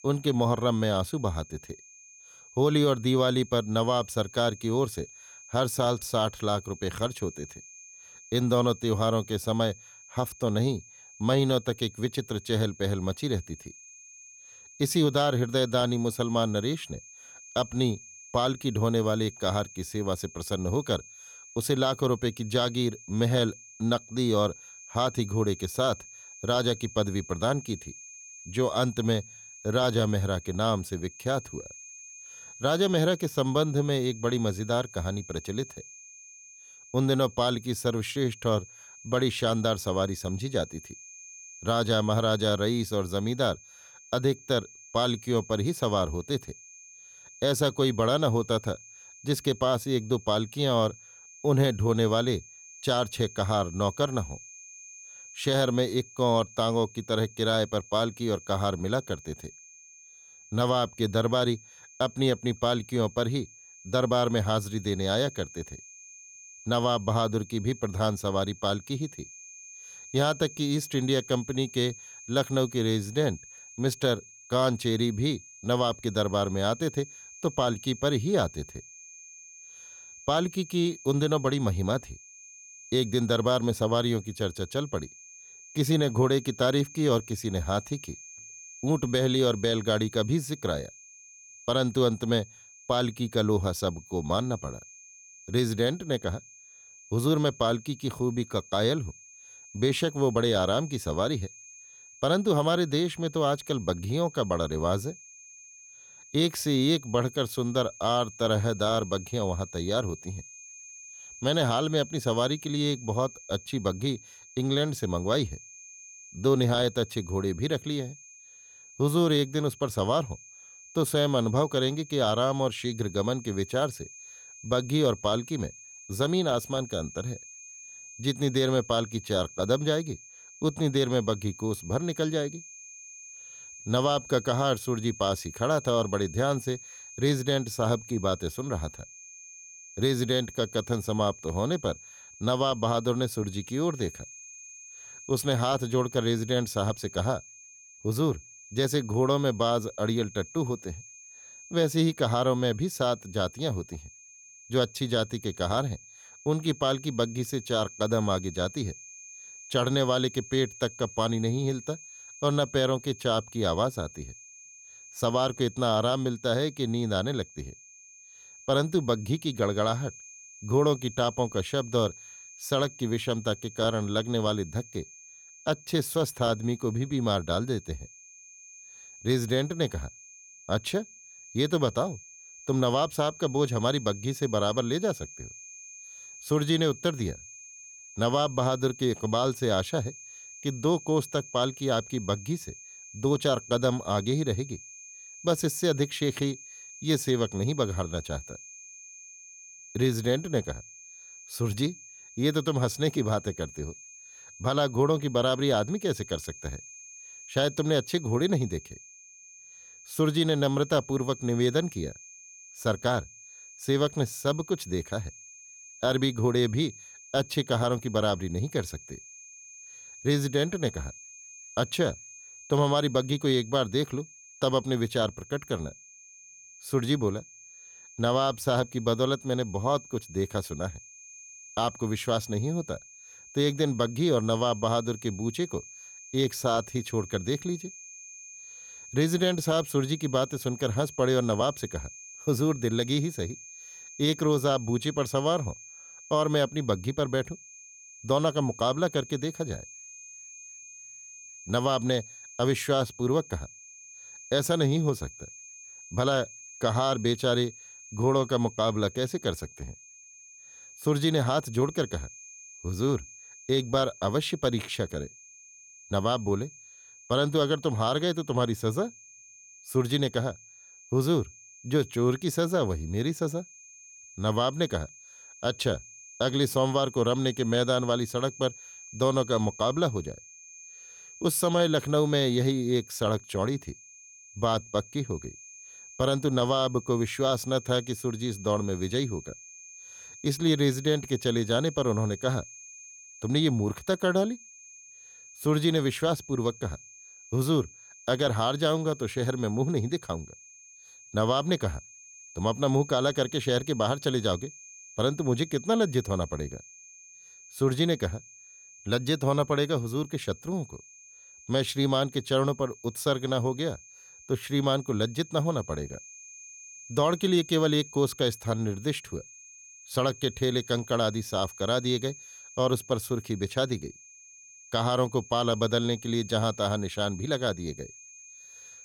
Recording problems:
high-pitched whine; noticeable; throughout; 6.5 kHz, 20 dB below the speech

